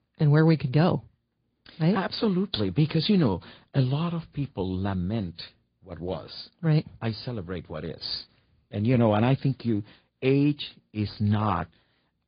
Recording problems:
high frequencies cut off; severe; nothing above 5 kHz
garbled, watery; slightly

